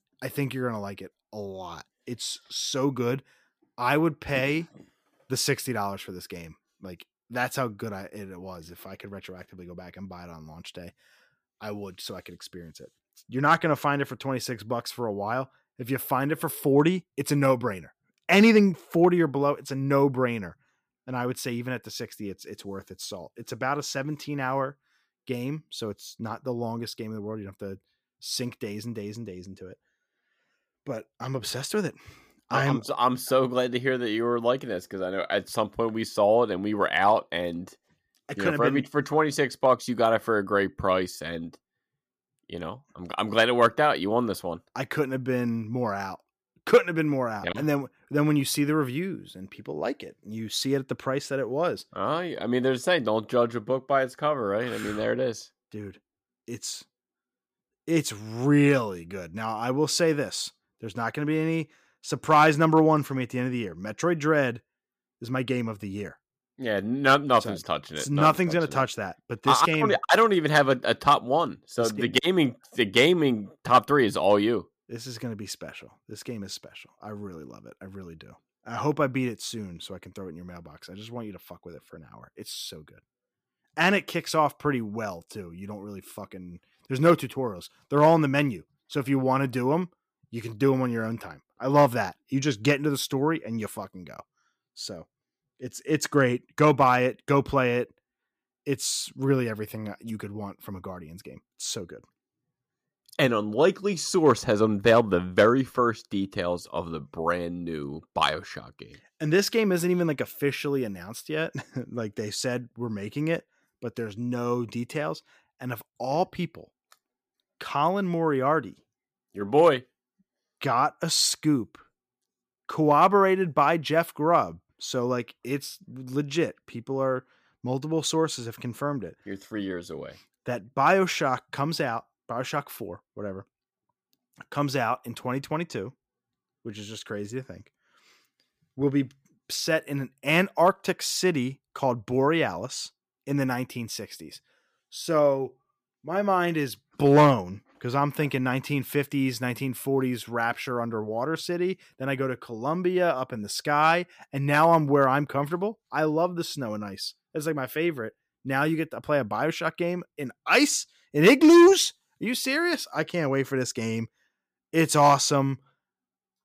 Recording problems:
none

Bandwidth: 15 kHz